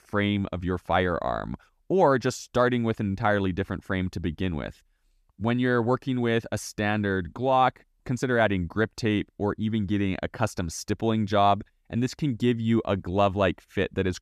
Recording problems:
none

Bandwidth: 14.5 kHz